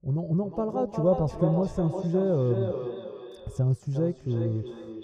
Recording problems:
echo of what is said; strong; throughout; 360 ms later, 8 dB below the speech
muffled; very; fading above 1.5 kHz

